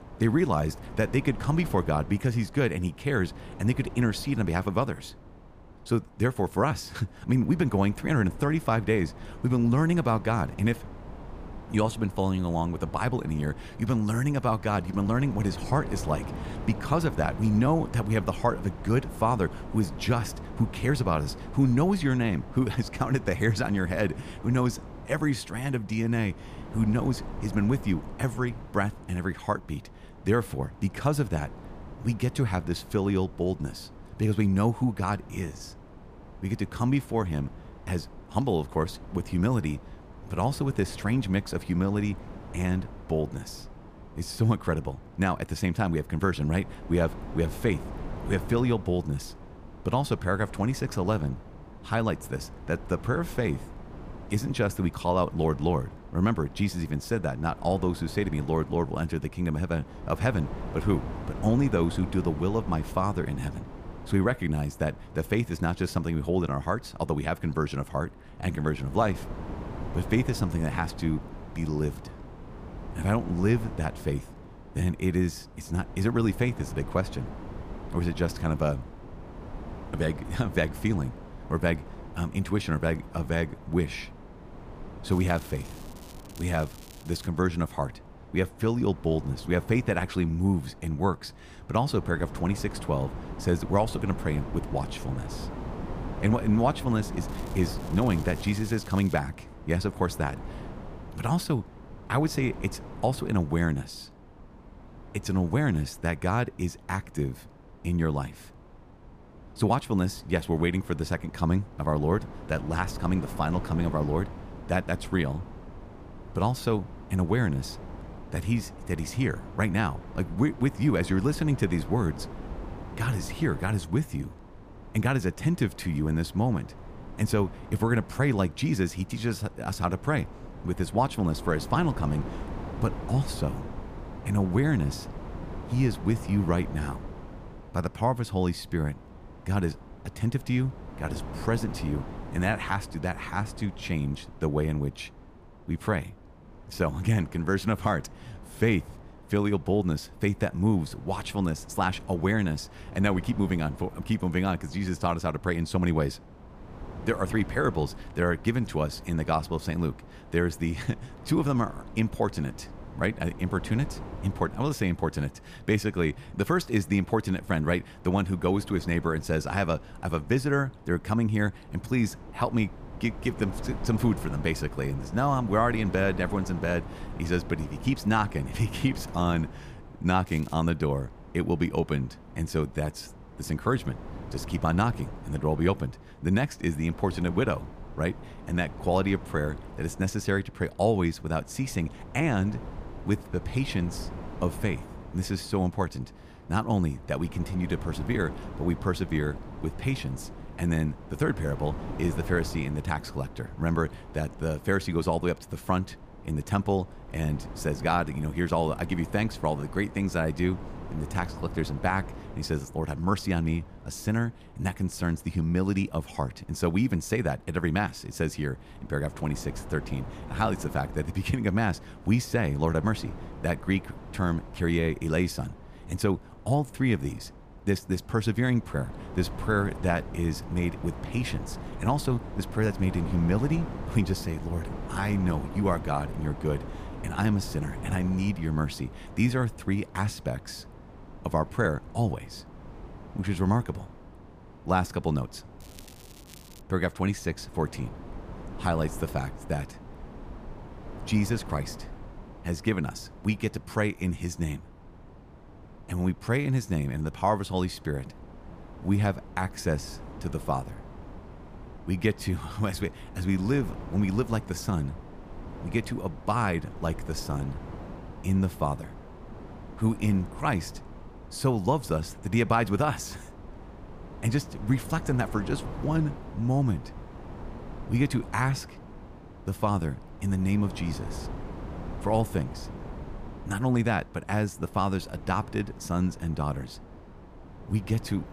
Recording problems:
wind noise on the microphone; occasional gusts; 15 dB below the speech
crackling; faint; 4 times, first at 1:25; 20 dB below the speech

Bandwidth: 15 kHz